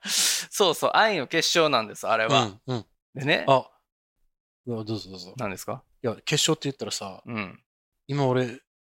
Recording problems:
none

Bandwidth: 16 kHz